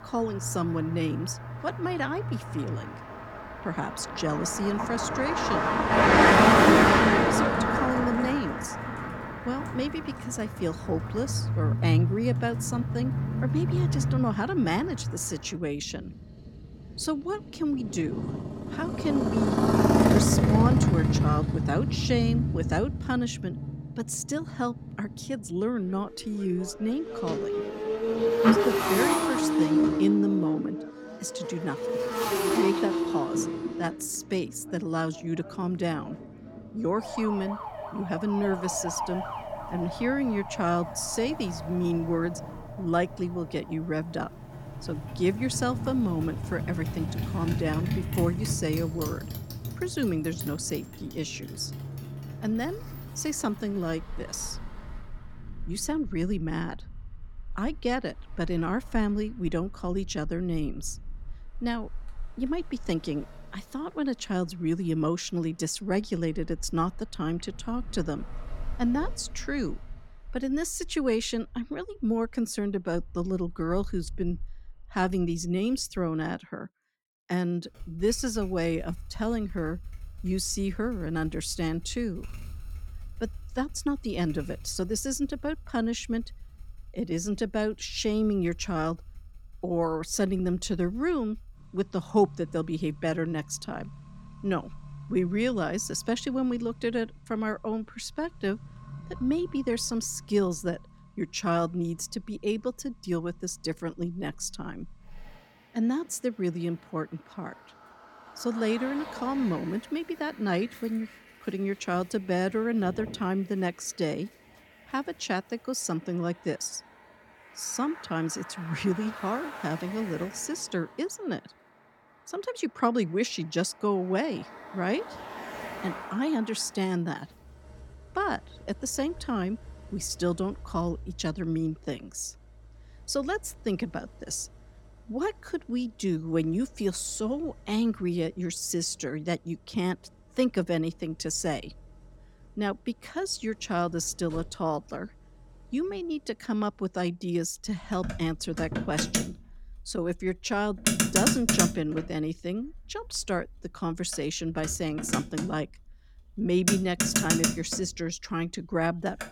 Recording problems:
traffic noise; very loud; throughout; 2 dB above the speech

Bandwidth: 17 kHz